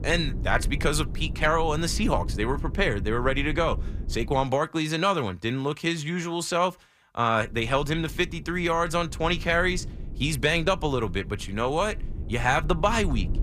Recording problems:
low rumble; faint; until 4.5 s and from 7.5 s on; 20 dB below the speech

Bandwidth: 15 kHz